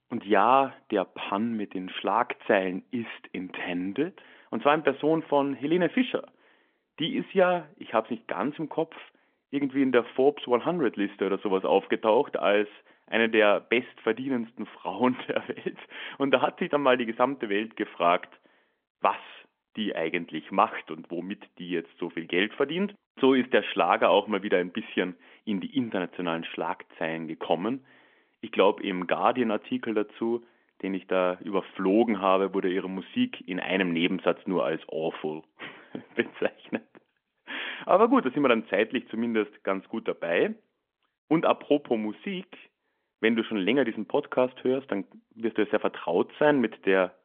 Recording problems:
phone-call audio; nothing above 3.5 kHz

